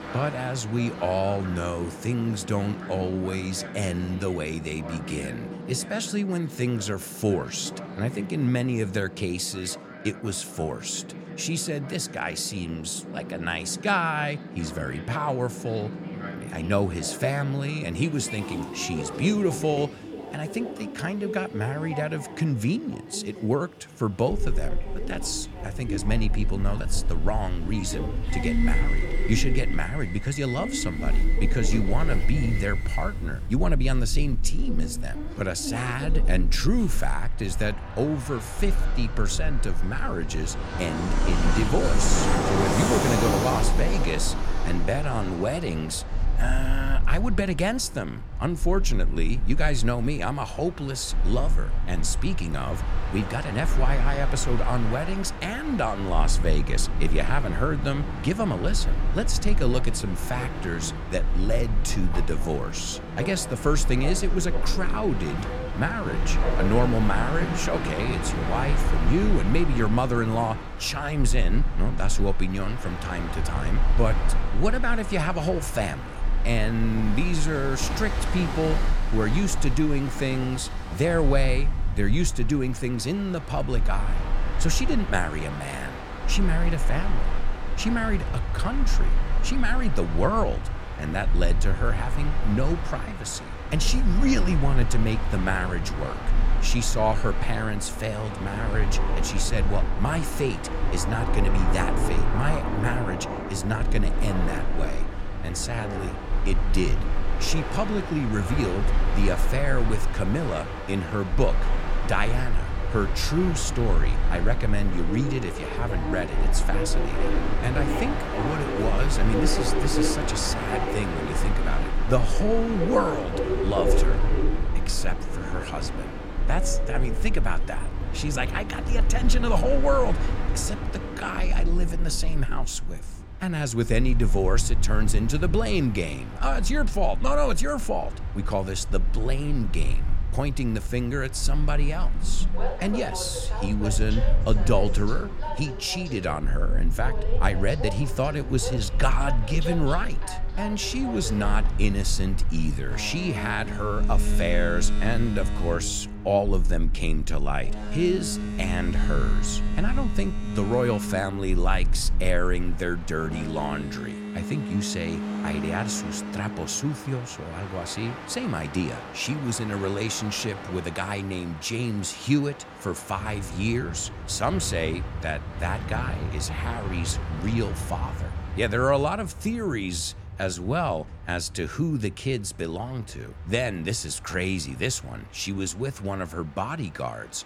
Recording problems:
train or aircraft noise; loud; throughout; 6 dB below the speech
low rumble; faint; from 24 s to 2:44; 20 dB below the speech

